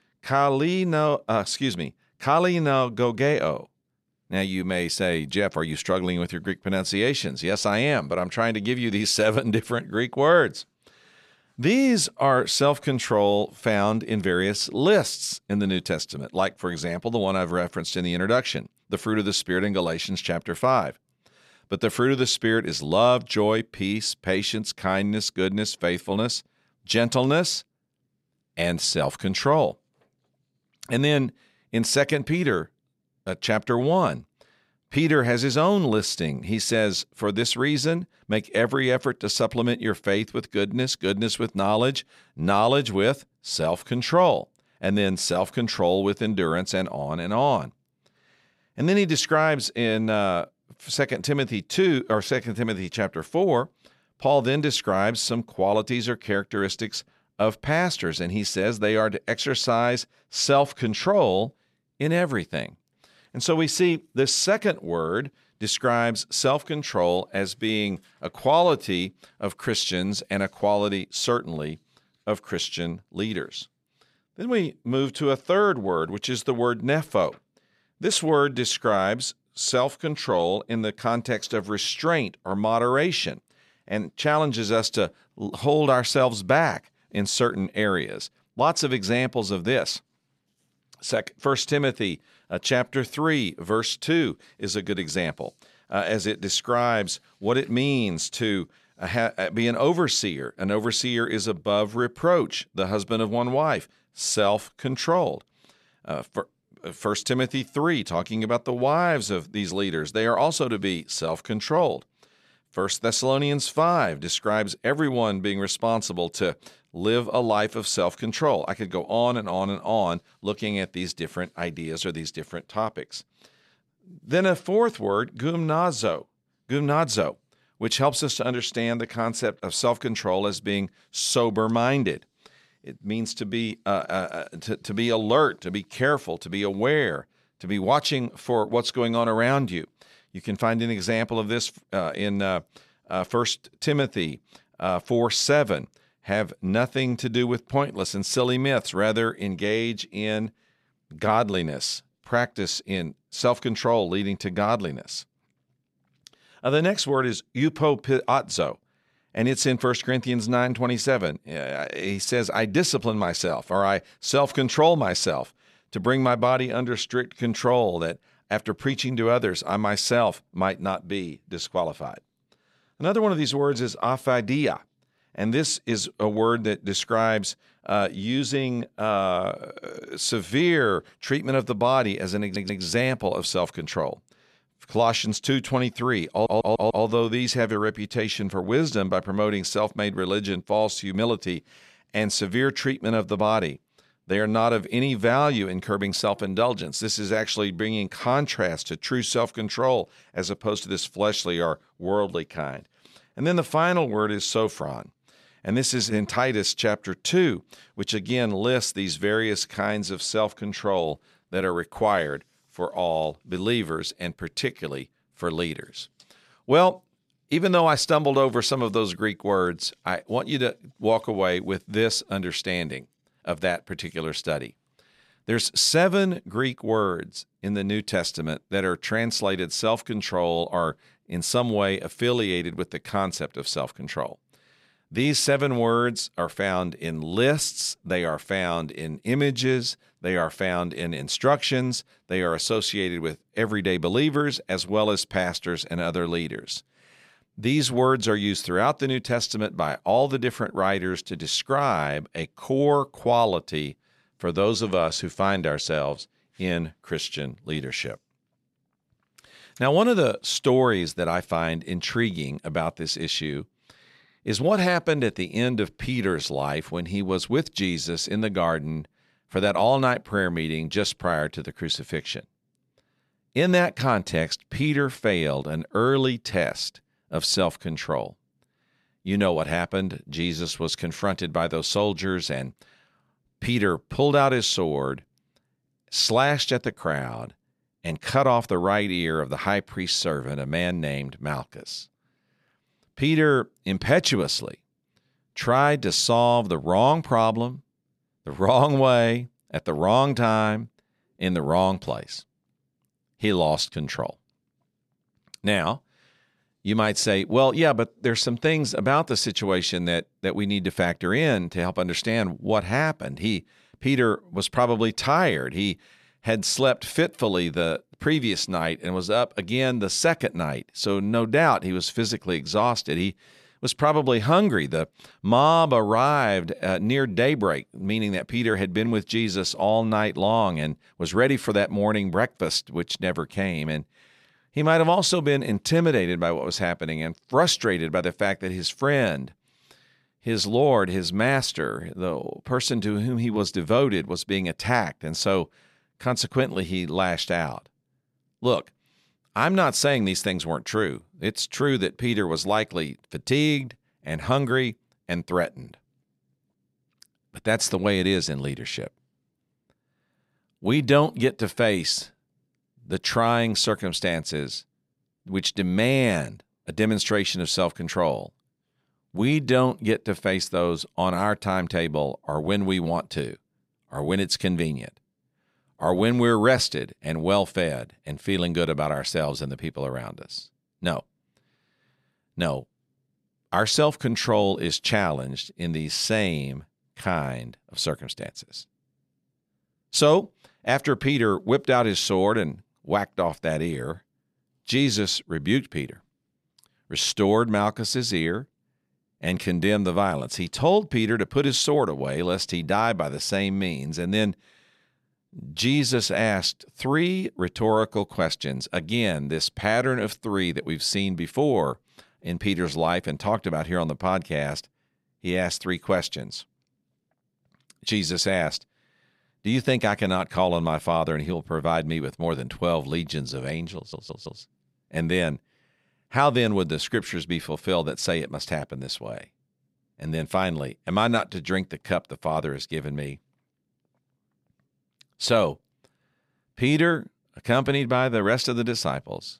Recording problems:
audio stuttering; at 3:02, at 3:06 and at 7:04

